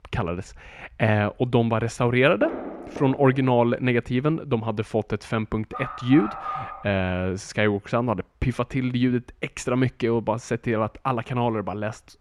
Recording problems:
muffled; slightly; fading above 1.5 kHz
footsteps; noticeable; from 2.5 to 3.5 s; peak 8 dB below the speech
dog barking; noticeable; from 5.5 to 7 s; peak 7 dB below the speech

